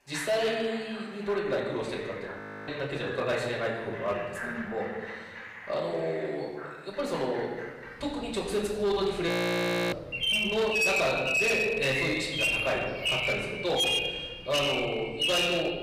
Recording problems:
off-mic speech; far
room echo; noticeable; dies away in 1.3 s
distortion; slight; 7% of the sound clipped
animal sounds; very loud; throughout; 3 dB above the speech
audio freezing; at 2.5 s and at 9.5 s for 0.5 s

